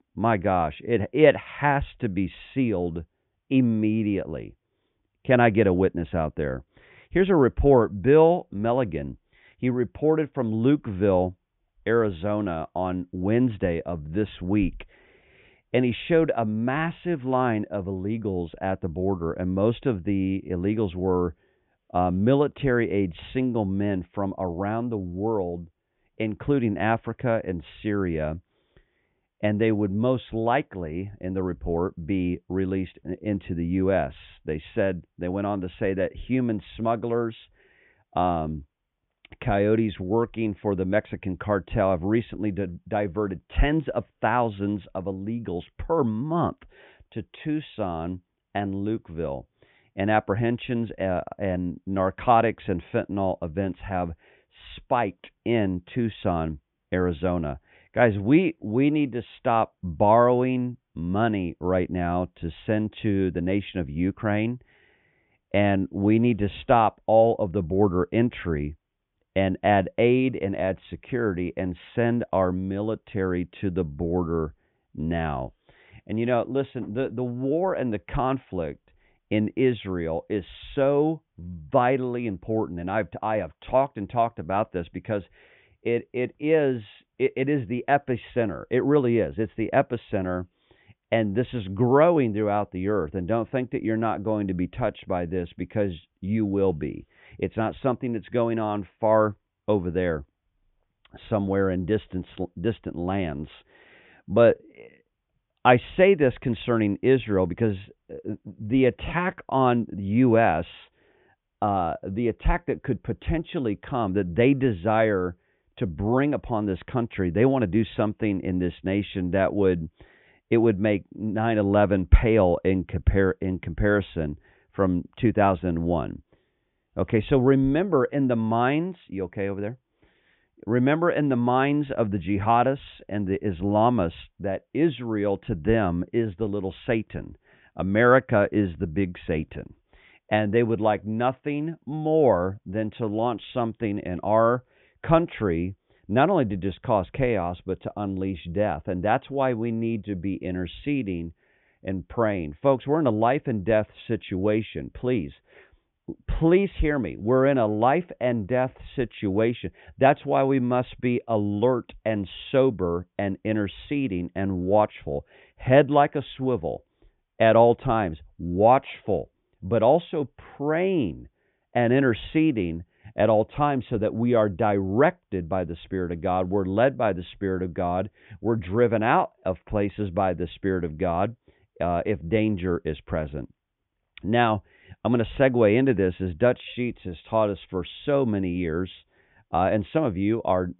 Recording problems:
high frequencies cut off; severe; nothing above 3.5 kHz

